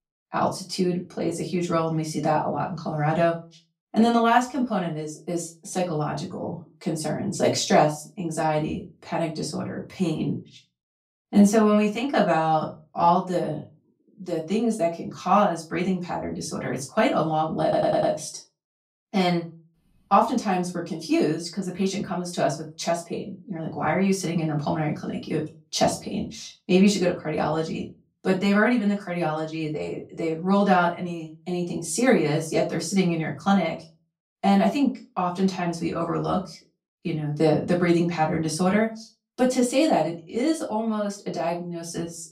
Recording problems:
off-mic speech; far
room echo; very slight; dies away in 0.3 s
audio stuttering; at 18 s

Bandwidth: 15.5 kHz